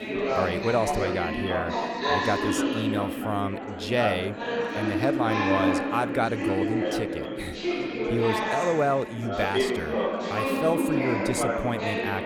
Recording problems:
chatter from many people; very loud; throughout; 1 dB above the speech

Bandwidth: 19 kHz